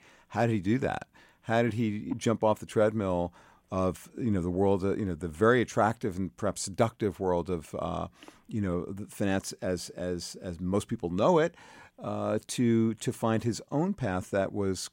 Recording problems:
none

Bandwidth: 16 kHz